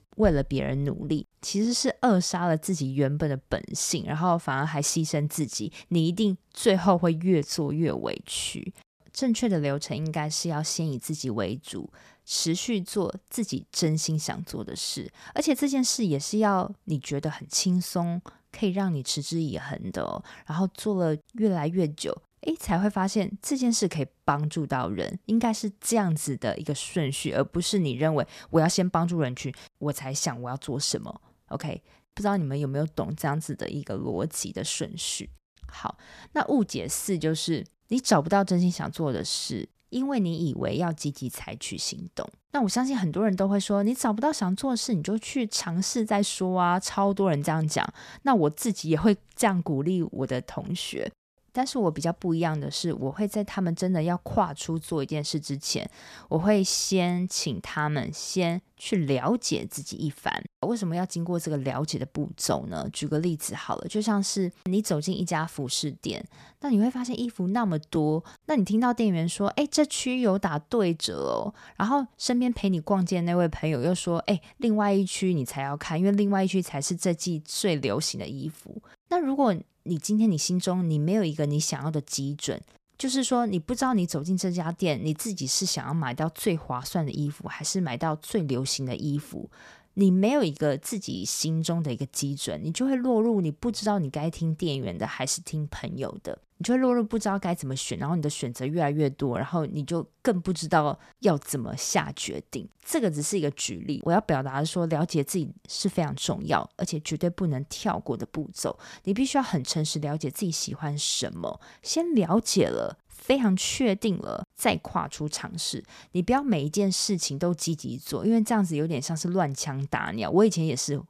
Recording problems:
none

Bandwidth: 14.5 kHz